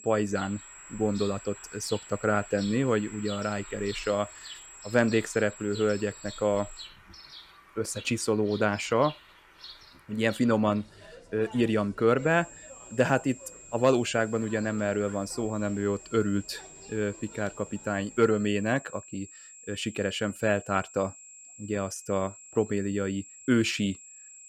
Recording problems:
high-pitched whine; noticeable; until 7 s and from 12 s on; 7.5 kHz, 20 dB below the speech
animal sounds; noticeable; until 18 s; 20 dB below the speech

